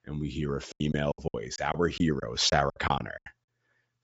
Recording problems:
high frequencies cut off; noticeable; nothing above 8 kHz
choppy; very; 16% of the speech affected

